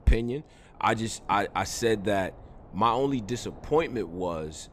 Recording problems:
wind noise on the microphone; occasional gusts; 25 dB below the speech

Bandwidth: 14.5 kHz